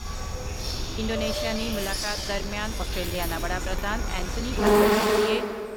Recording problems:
animal sounds; very loud; throughout; 5 dB above the speech
uneven, jittery; strongly; from 1 to 5 s

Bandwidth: 16.5 kHz